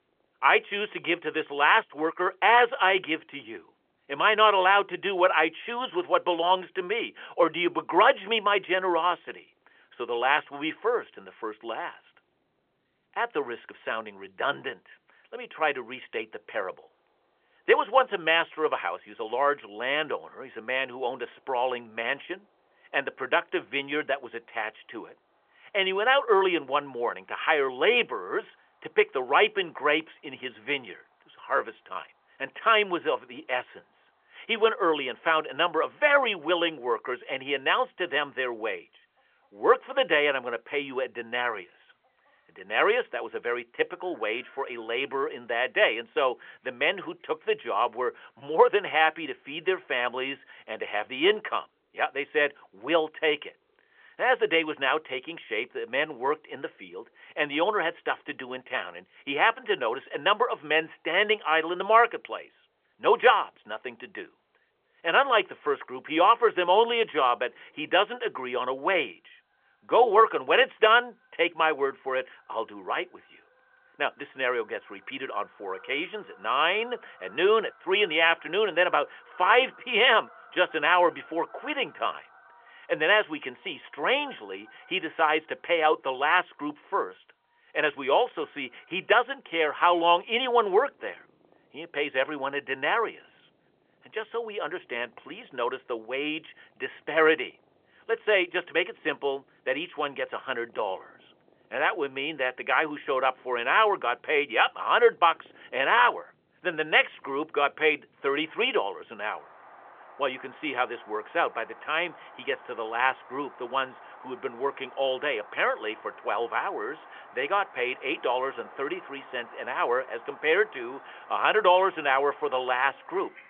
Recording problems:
phone-call audio; nothing above 3.5 kHz
animal sounds; faint; throughout; 25 dB below the speech

